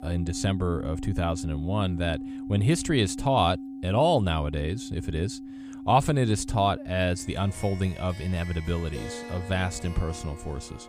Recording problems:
background music; noticeable; throughout; 10 dB below the speech

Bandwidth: 15 kHz